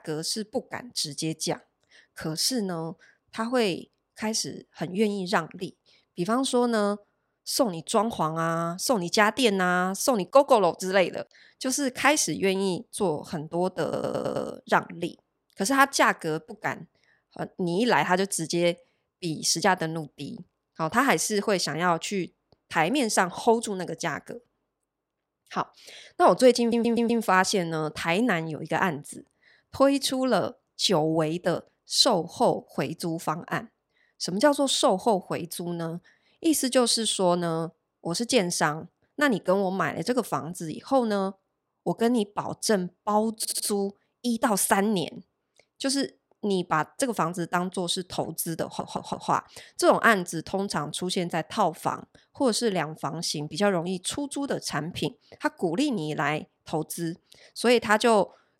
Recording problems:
audio stuttering; 4 times, first at 14 s

